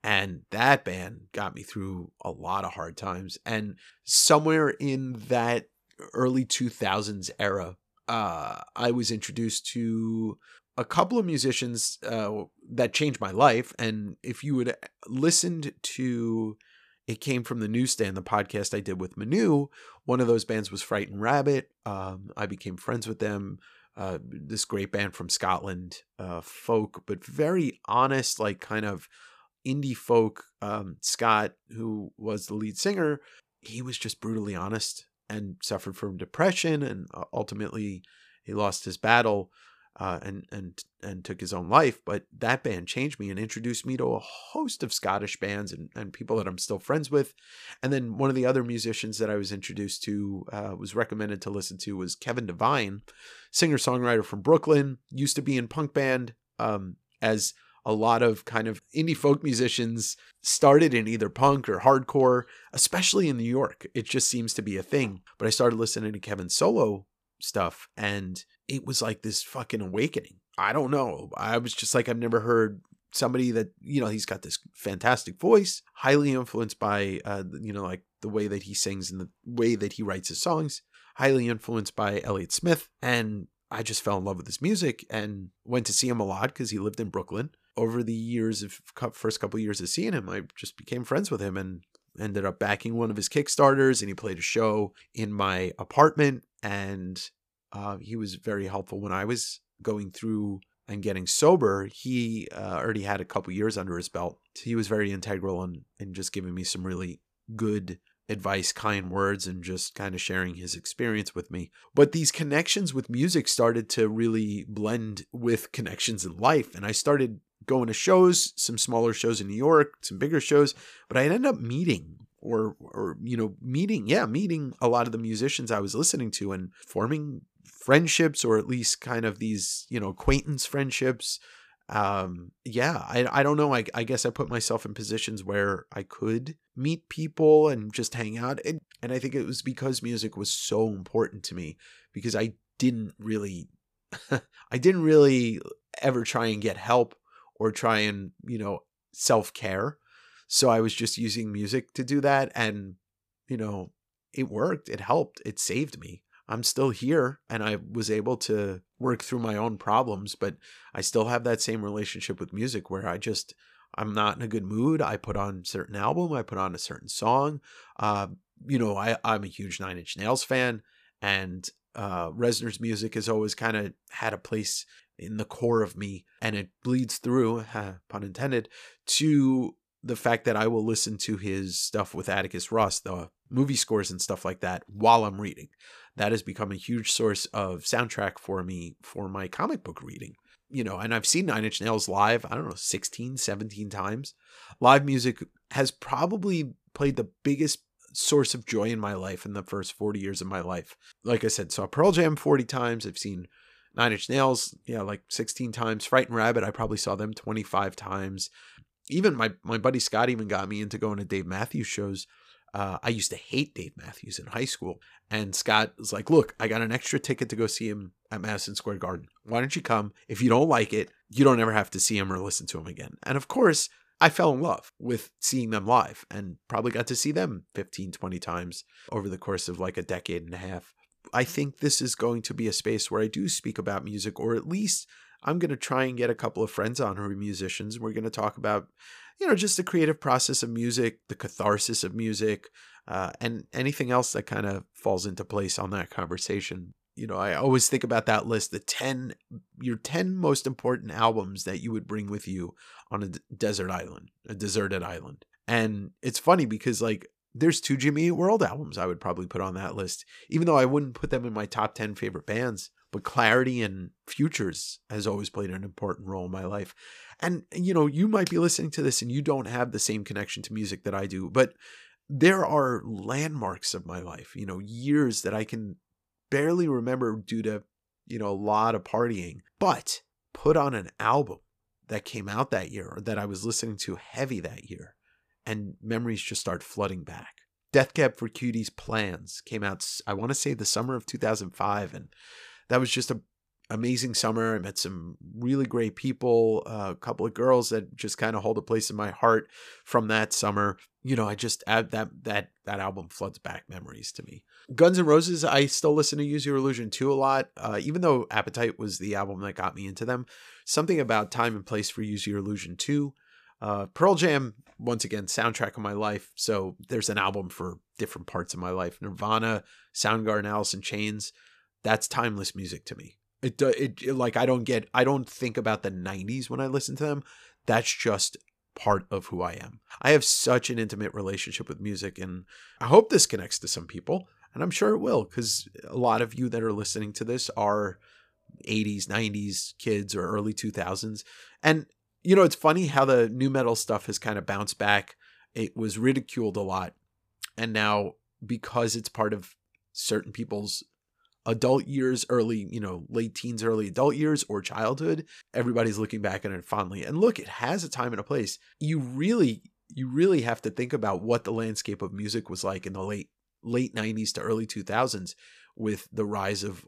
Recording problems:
none

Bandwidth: 14.5 kHz